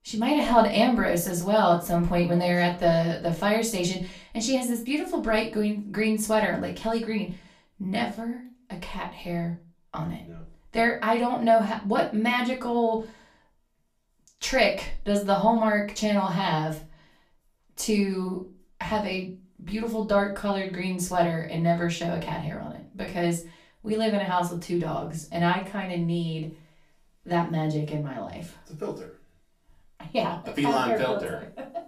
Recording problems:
off-mic speech; far
room echo; very slight; dies away in 0.3 s

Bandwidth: 14.5 kHz